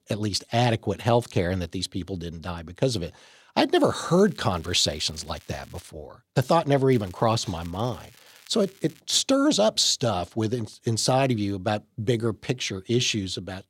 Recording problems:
crackling; faint; from 4 to 6 s and from 7 to 9 s; 25 dB below the speech

